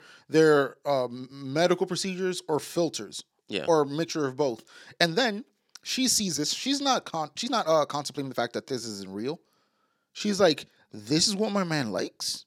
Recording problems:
uneven, jittery; strongly; from 1 to 11 s

